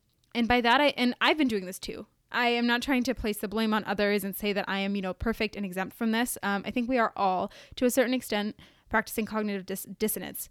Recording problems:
none

